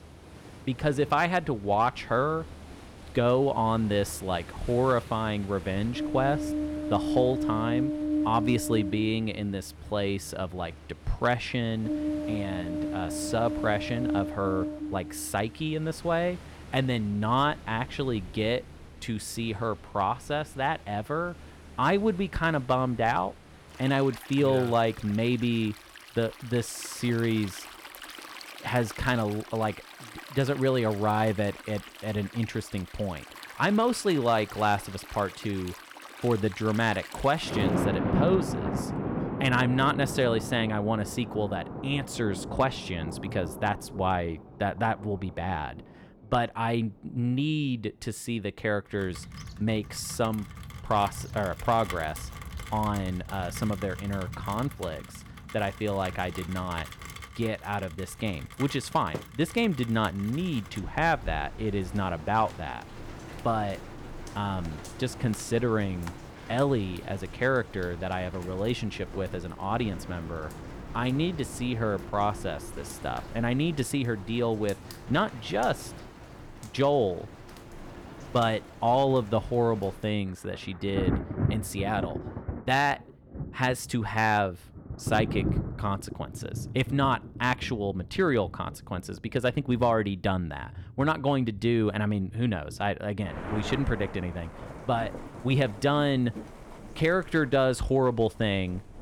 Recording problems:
rain or running water; loud; throughout; 9 dB below the speech

